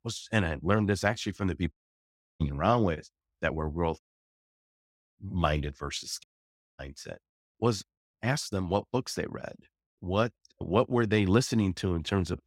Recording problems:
audio cutting out; at 1.5 s for 0.5 s, at 4 s for 1 s and at 6 s for 0.5 s

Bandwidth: 16 kHz